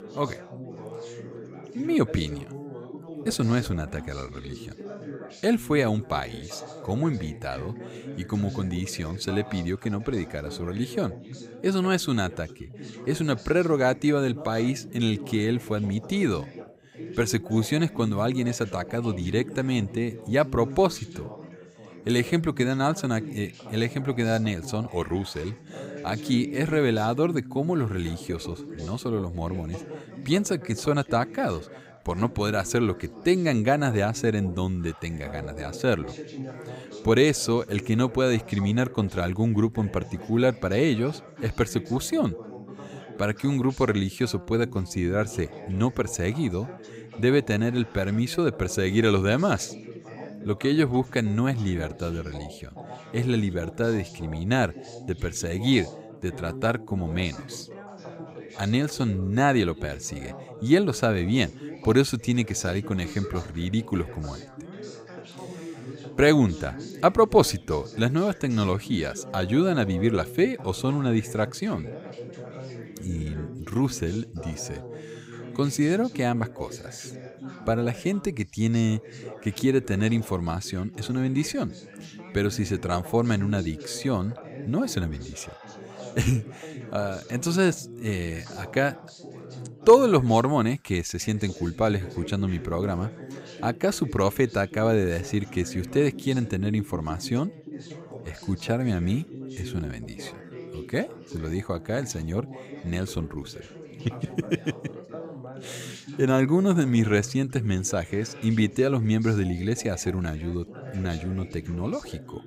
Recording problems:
background chatter; noticeable; throughout; 3 voices, 15 dB below the speech

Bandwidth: 15.5 kHz